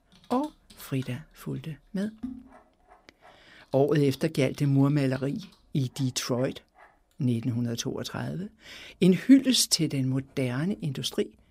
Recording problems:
household noises; faint; throughout; 25 dB below the speech

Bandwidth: 15.5 kHz